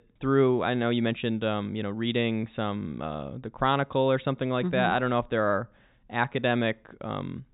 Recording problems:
high frequencies cut off; severe; nothing above 4 kHz

